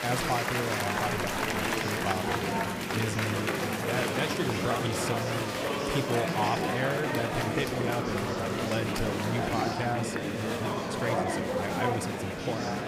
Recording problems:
murmuring crowd; very loud; throughout; 4 dB above the speech

